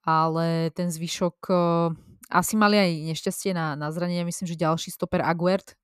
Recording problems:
none

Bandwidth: 14.5 kHz